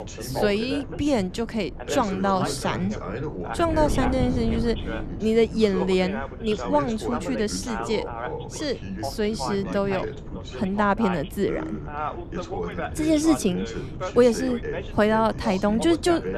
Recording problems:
background chatter; loud; throughout; 2 voices, 8 dB below the speech
wind noise on the microphone; occasional gusts; 20 dB below the speech

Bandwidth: 13.5 kHz